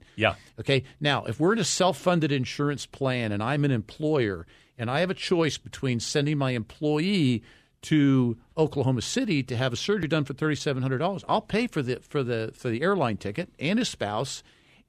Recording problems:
none

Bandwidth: 14.5 kHz